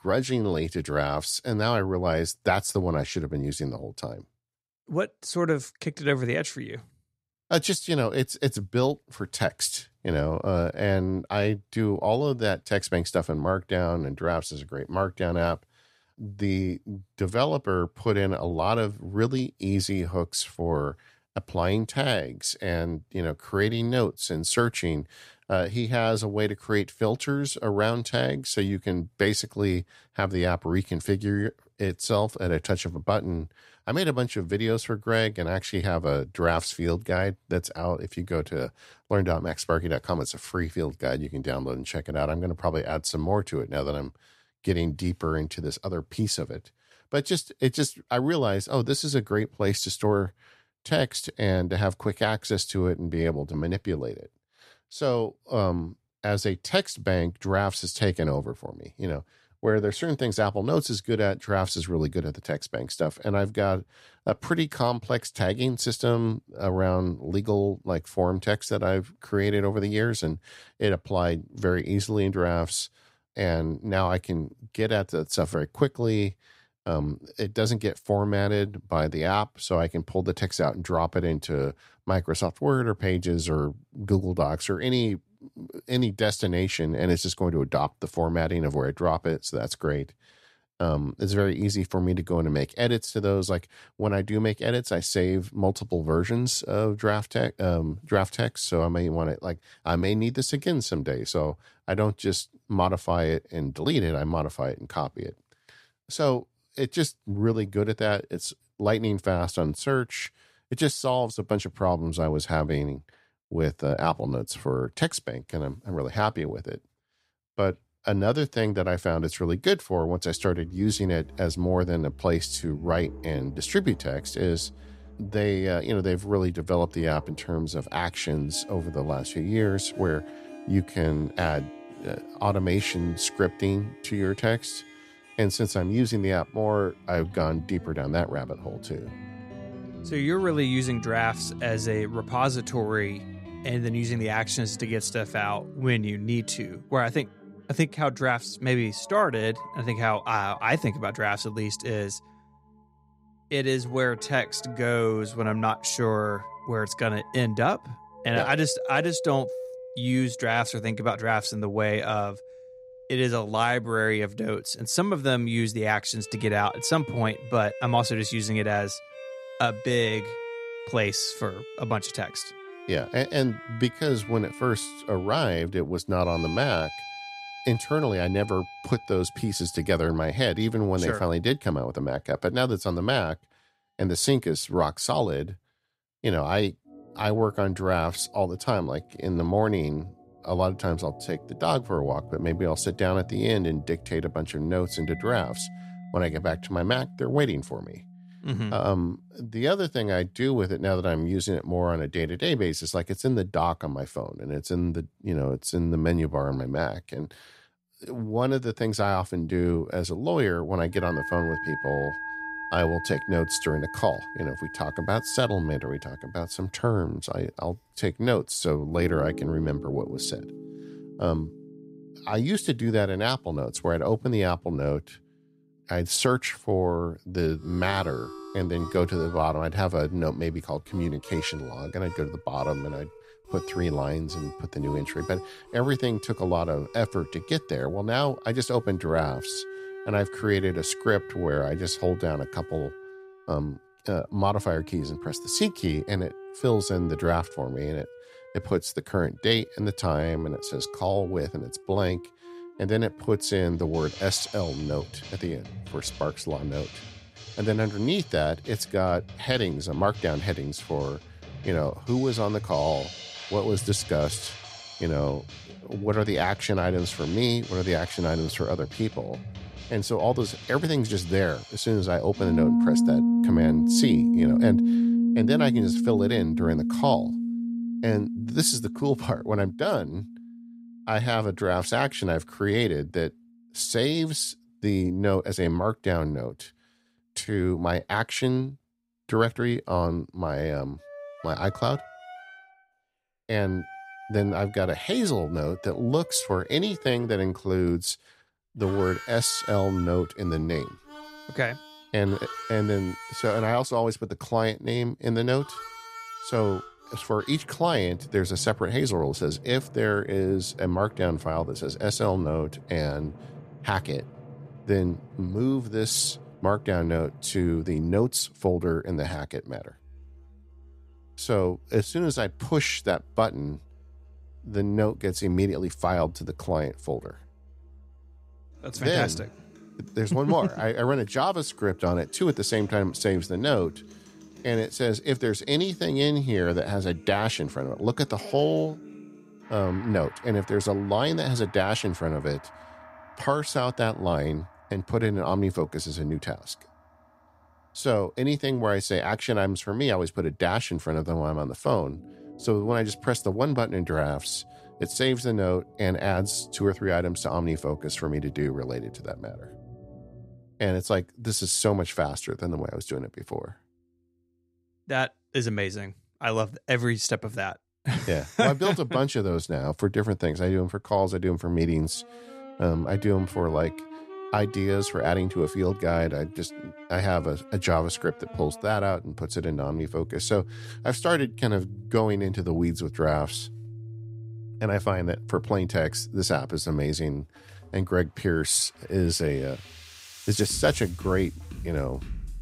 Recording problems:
background music; loud; from 2:00 on; 9 dB below the speech

